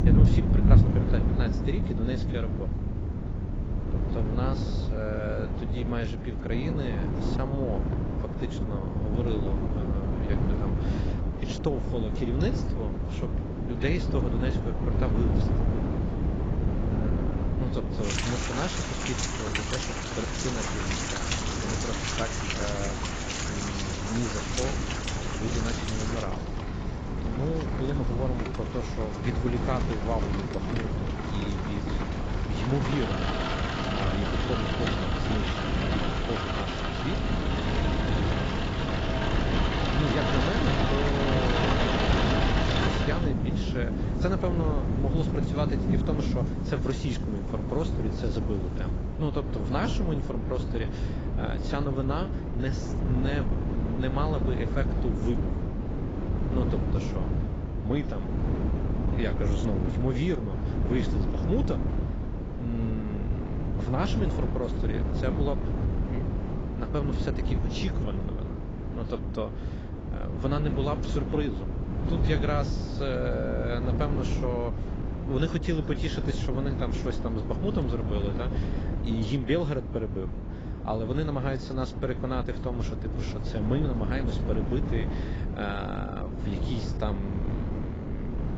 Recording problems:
garbled, watery; badly; nothing above 7.5 kHz
rain or running water; very loud; until 49 s; 2 dB above the speech
wind noise on the microphone; heavy; 3 dB below the speech

